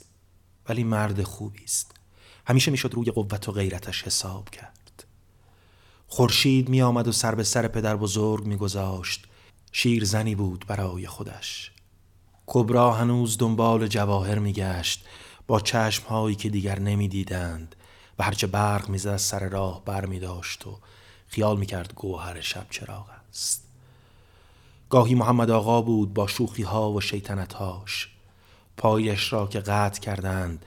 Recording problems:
uneven, jittery; strongly; from 0.5 to 29 s

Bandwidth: 17 kHz